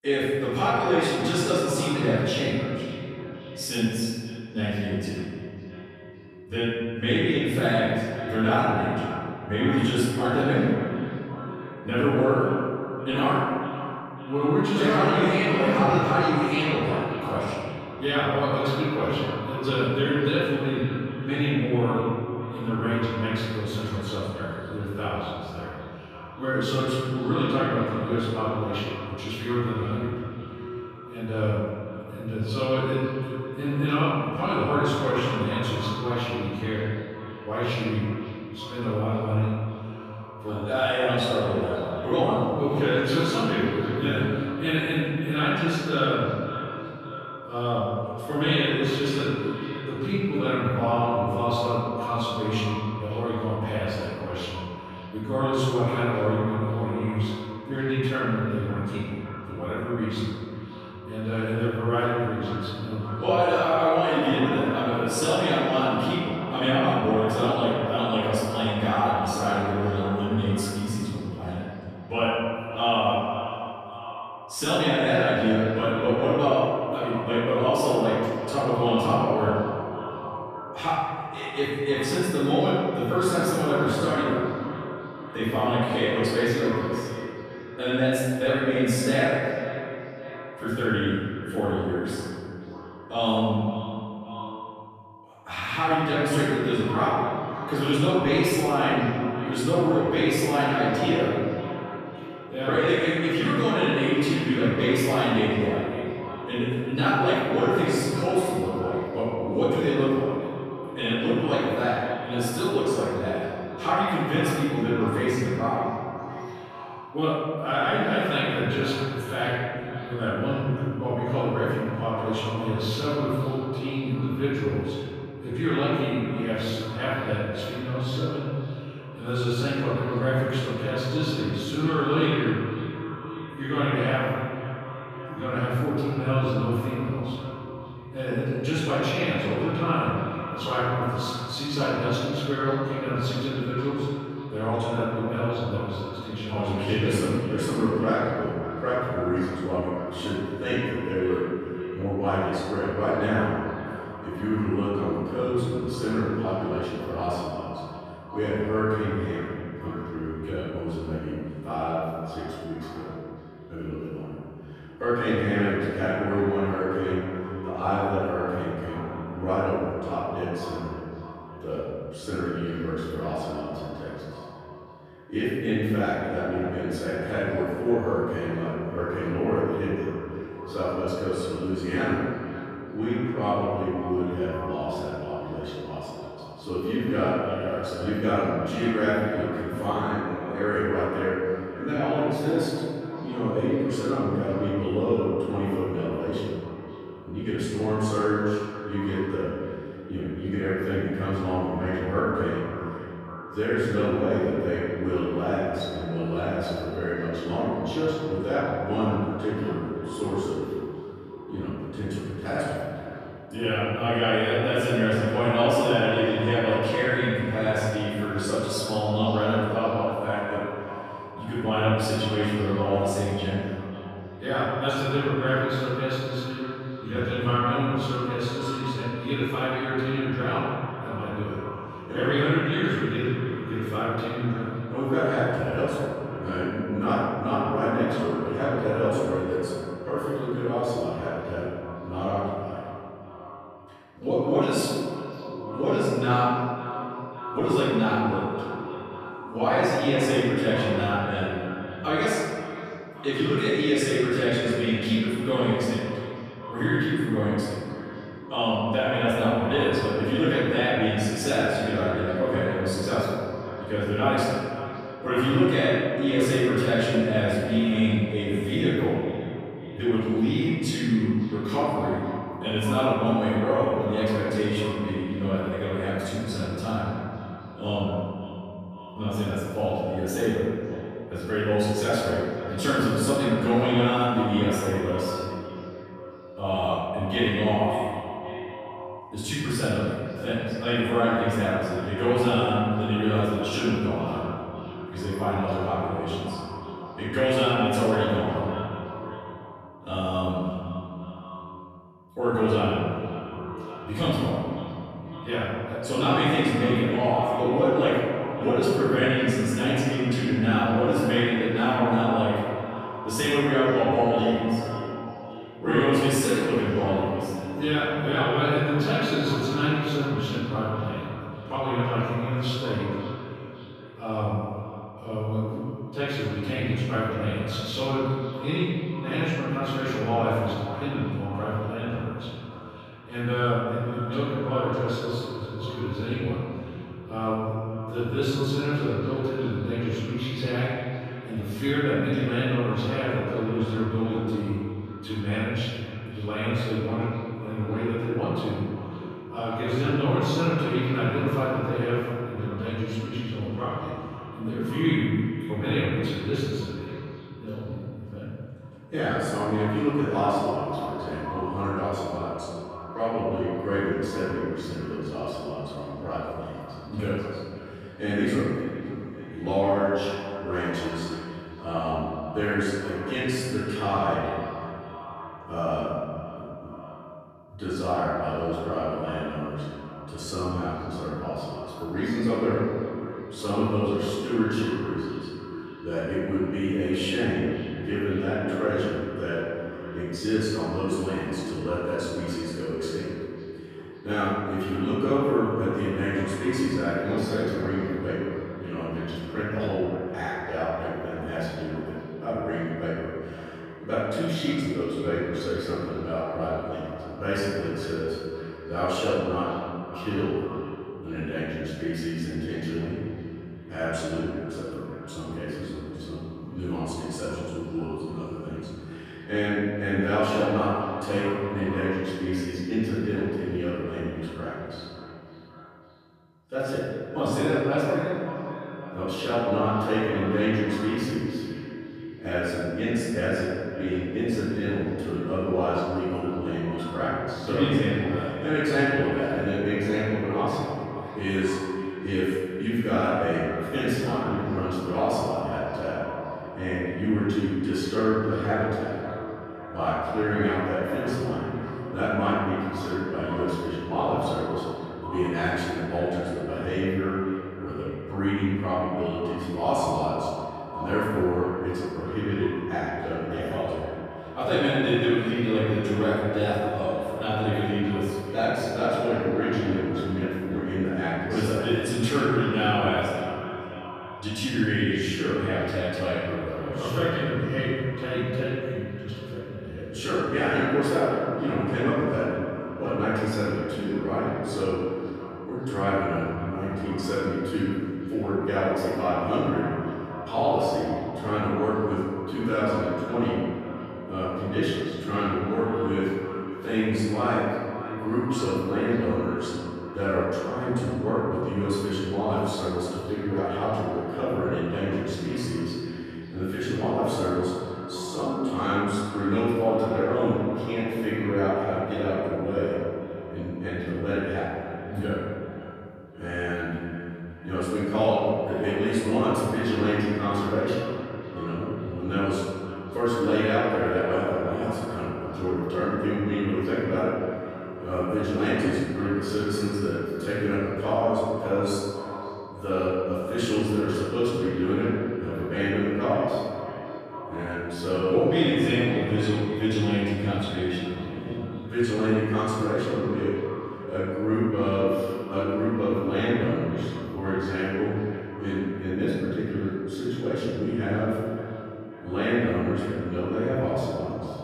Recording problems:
room echo; strong; dies away in 2.3 s
off-mic speech; far
echo of what is said; noticeable; throughout; 550 ms later, 10 dB below the speech

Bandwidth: 14.5 kHz